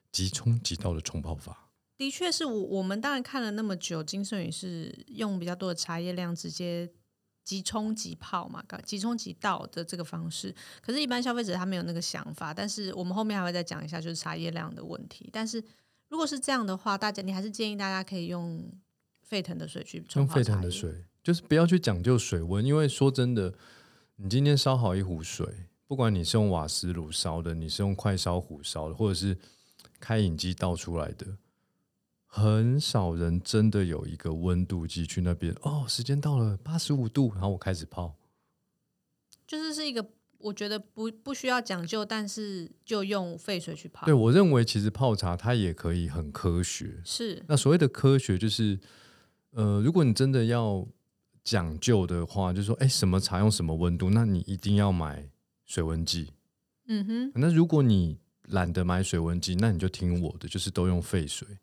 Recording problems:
none

